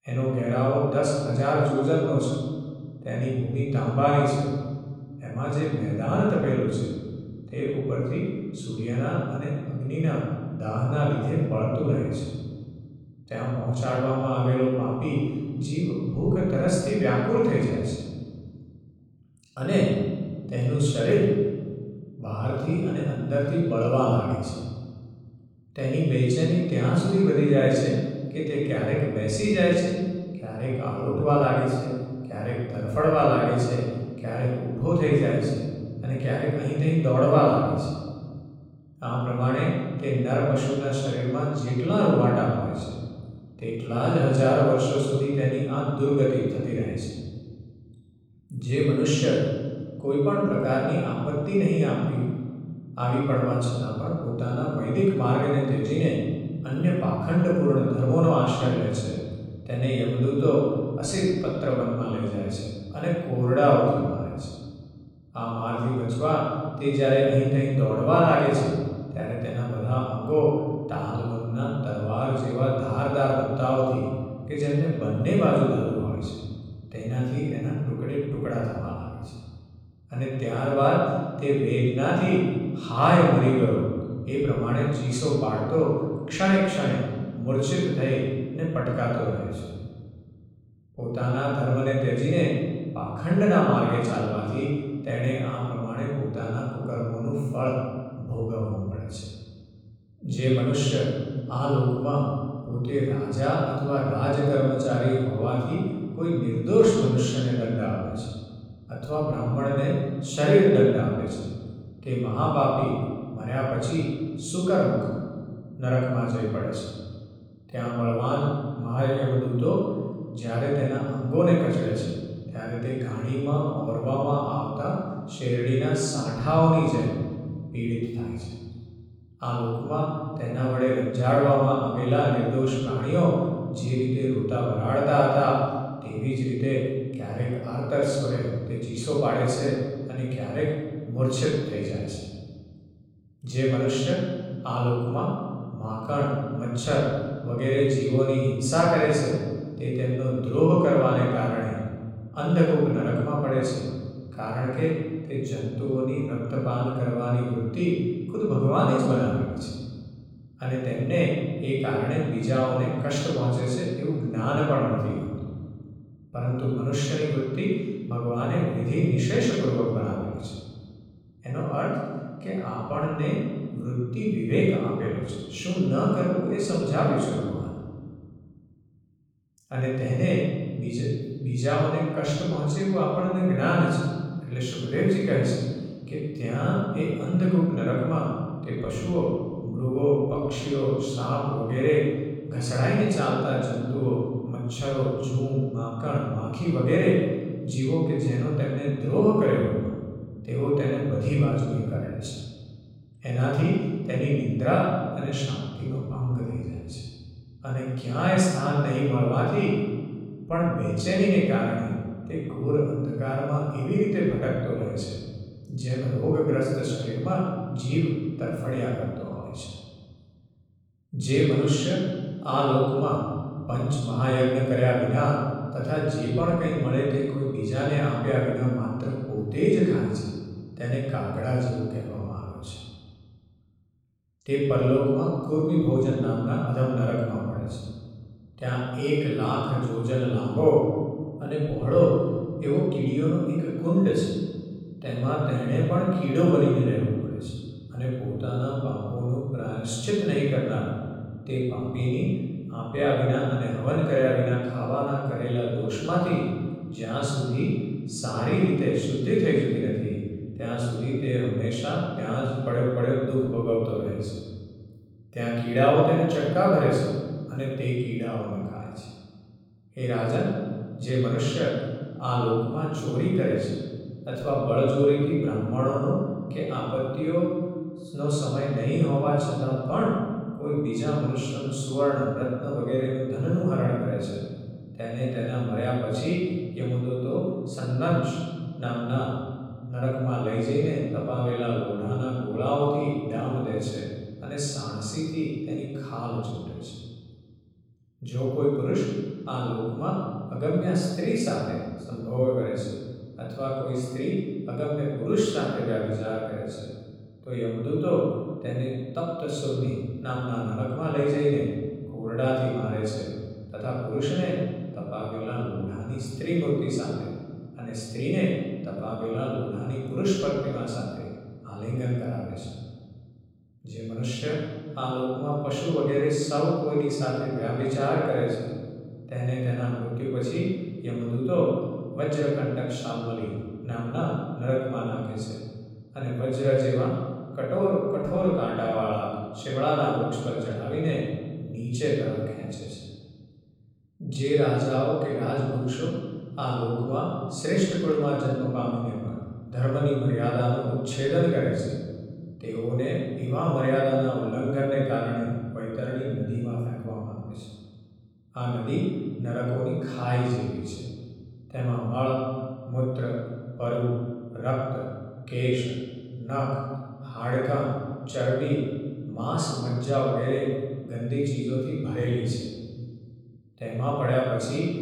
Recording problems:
room echo; strong; dies away in 1.9 s
off-mic speech; far

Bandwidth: 17 kHz